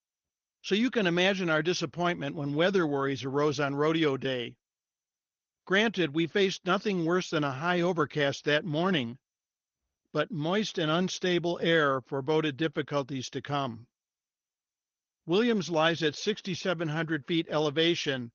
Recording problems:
garbled, watery; slightly; nothing above 6.5 kHz

